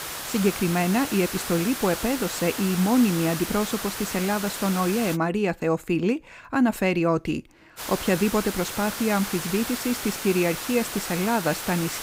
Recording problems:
hiss; loud; until 5 s and from 8 s on; 6 dB below the speech

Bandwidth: 15.5 kHz